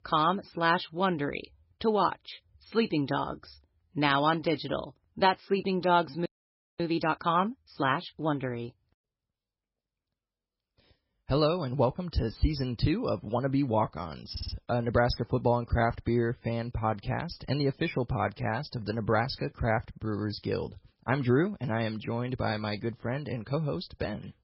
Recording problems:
garbled, watery; badly; nothing above 5.5 kHz
audio freezing; at 6.5 s for 0.5 s
audio stuttering; at 14 s

